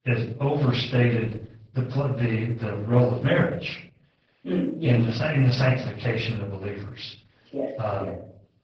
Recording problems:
off-mic speech; far
garbled, watery; badly; nothing above 8 kHz
room echo; noticeable; dies away in 0.5 s

